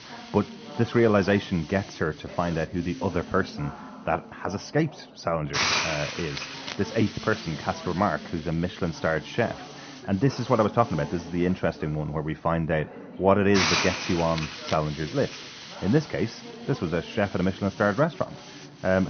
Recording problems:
high frequencies cut off; noticeable; nothing above 6.5 kHz
muffled; very slightly; fading above 2.5 kHz
hiss; loud; throughout; 4 dB below the speech
background chatter; noticeable; throughout; 4 voices, 15 dB below the speech
abrupt cut into speech; at the end

